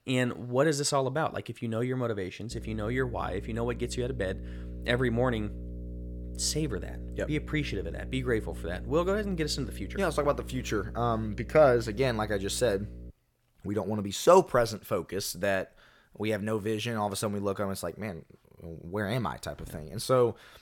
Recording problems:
electrical hum; faint; from 2.5 to 13 s; 60 Hz, 20 dB below the speech

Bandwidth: 17 kHz